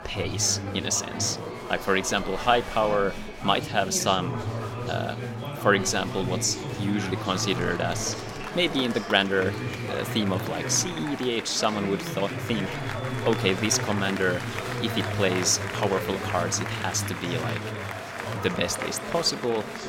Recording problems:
chatter from many people; loud; throughout; 6 dB below the speech

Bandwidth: 16.5 kHz